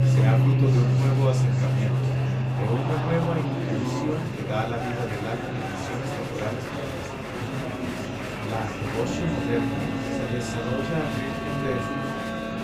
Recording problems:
off-mic speech; far
room echo; very slight; dies away in 0.3 s
background music; very loud; throughout; 4 dB above the speech
electrical hum; loud; throughout; 50 Hz, 7 dB below the speech
murmuring crowd; loud; throughout; 1 dB below the speech

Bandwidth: 15.5 kHz